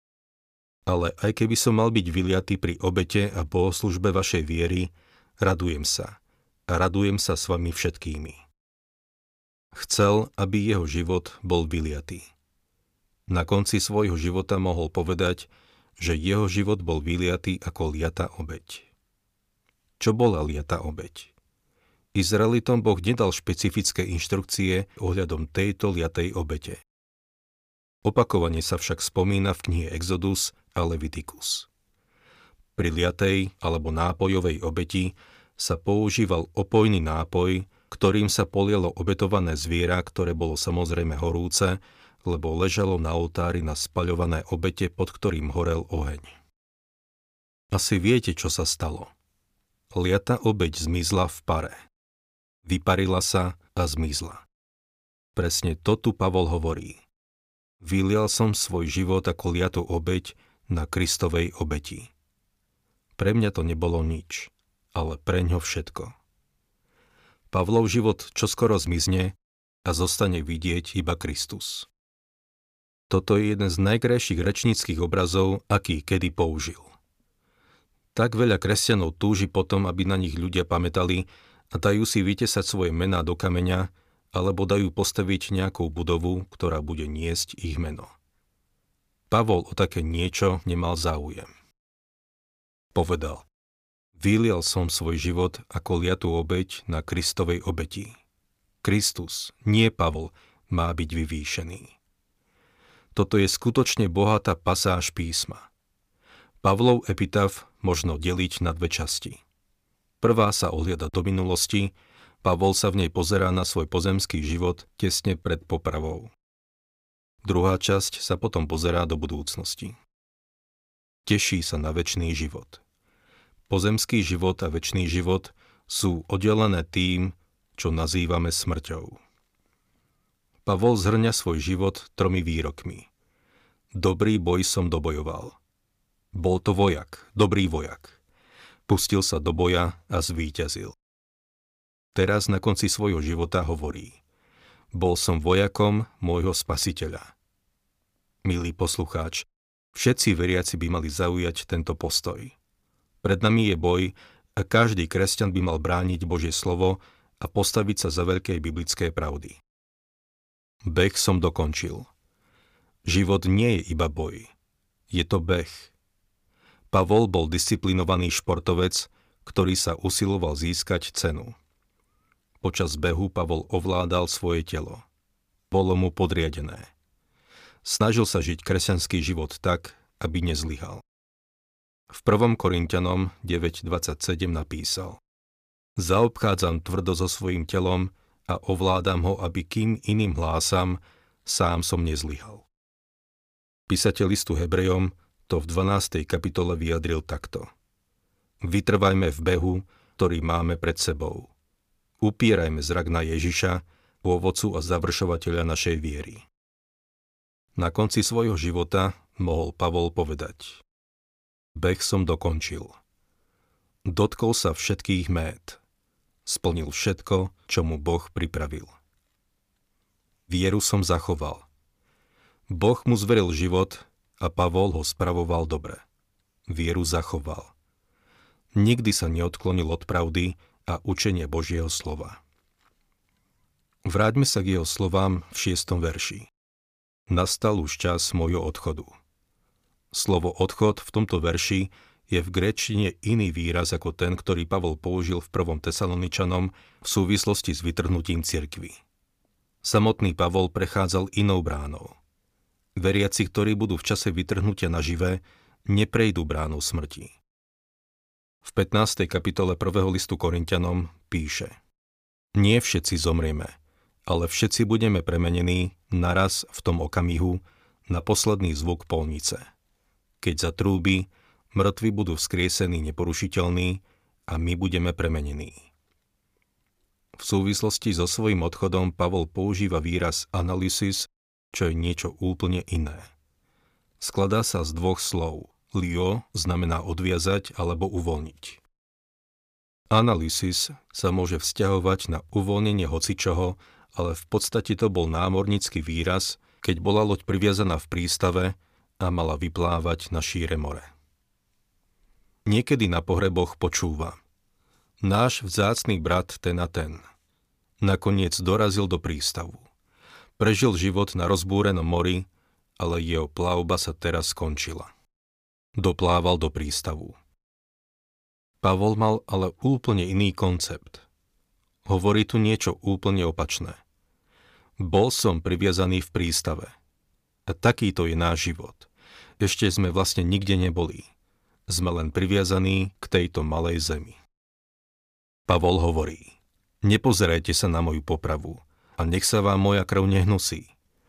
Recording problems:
none

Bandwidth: 15 kHz